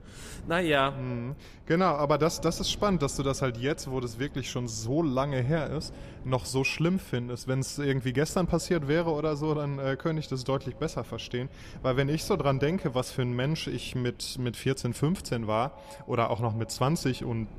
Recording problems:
echo of what is said; faint; throughout; 110 ms later, 25 dB below the speech
wind noise on the microphone; occasional gusts; 25 dB below the speech

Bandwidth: 14.5 kHz